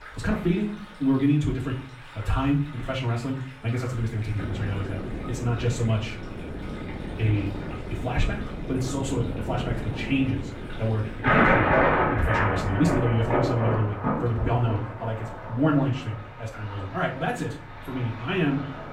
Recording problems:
off-mic speech; far
wrong speed, natural pitch; too fast; 1.6 times normal speed
muffled; slightly; fading above 3.5 kHz
room echo; slight; dies away in 0.4 s
rain or running water; very loud; throughout; 1 dB above the speech
wind noise on the microphone; heavy; from 4.5 to 13 s; 8 dB below the speech

